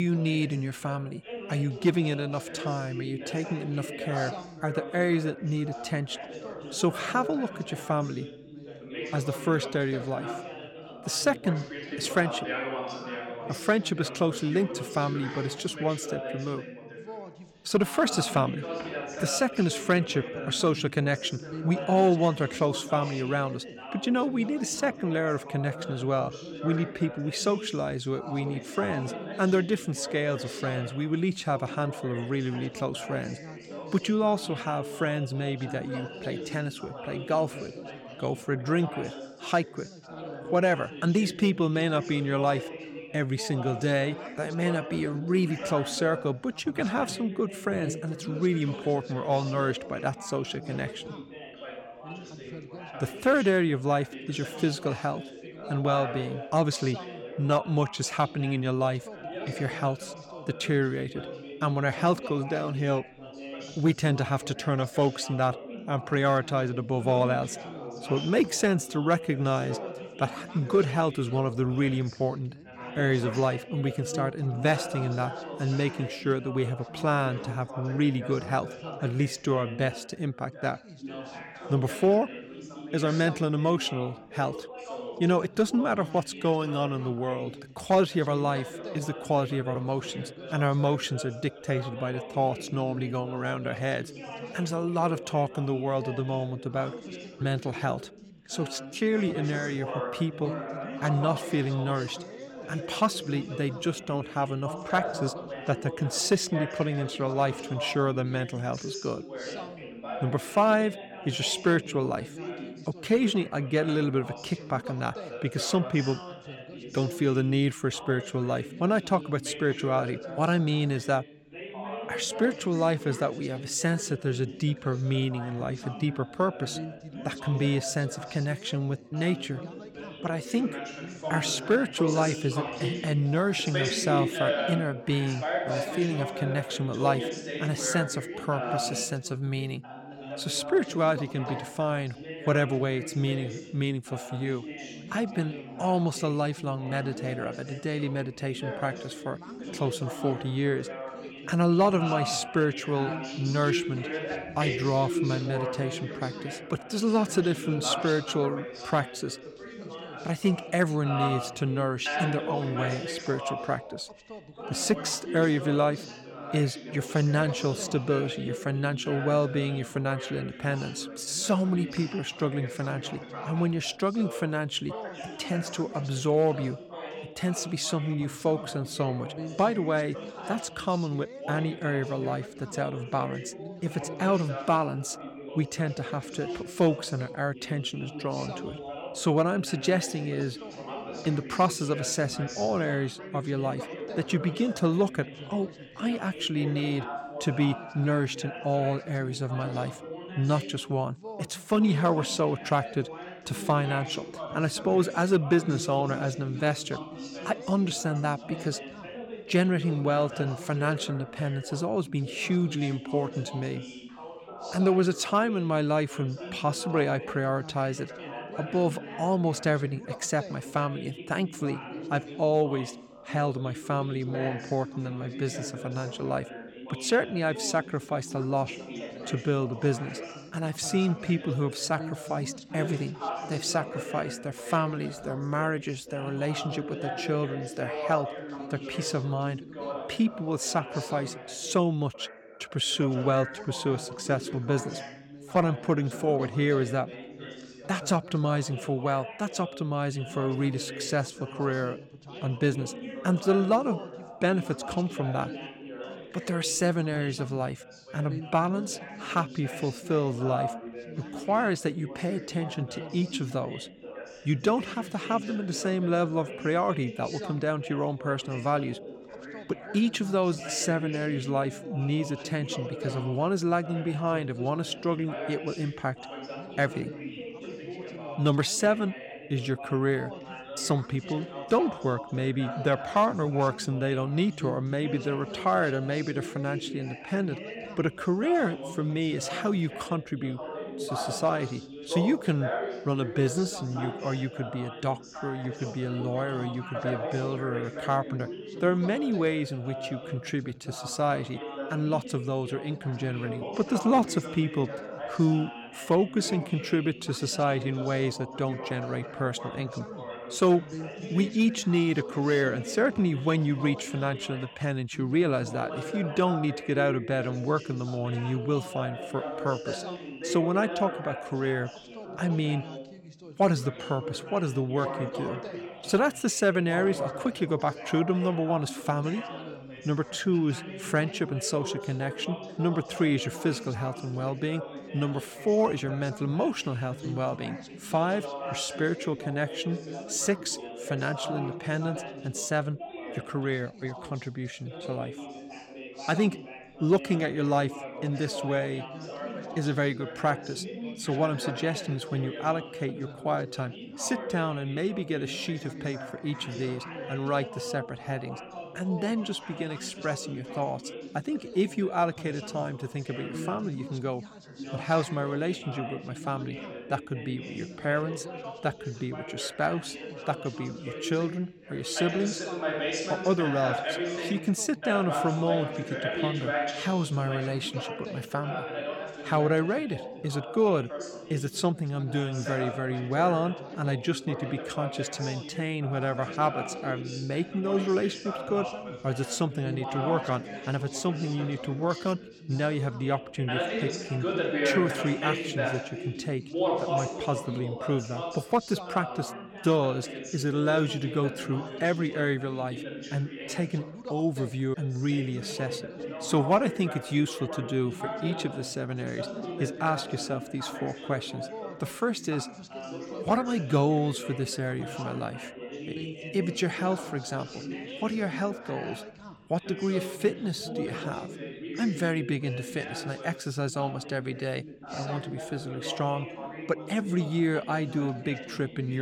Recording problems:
background chatter; loud; throughout; 3 voices, 9 dB below the speech
abrupt cut into speech; at the start and the end

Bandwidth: 17.5 kHz